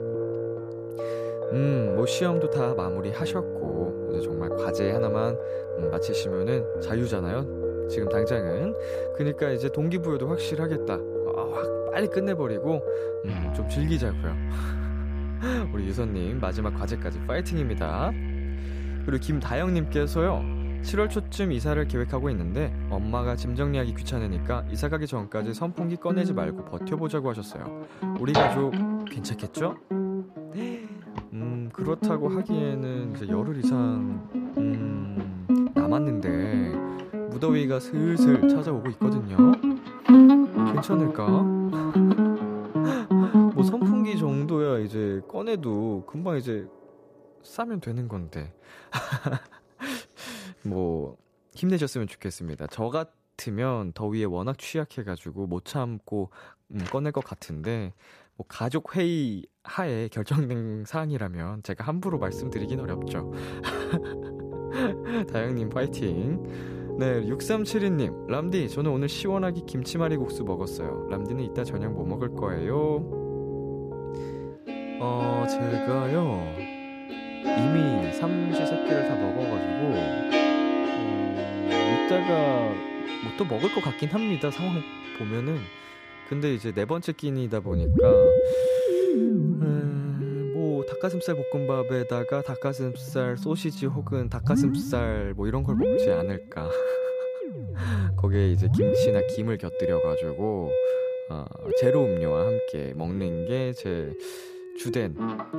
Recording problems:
background music; very loud; throughout; 3 dB above the speech

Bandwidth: 14.5 kHz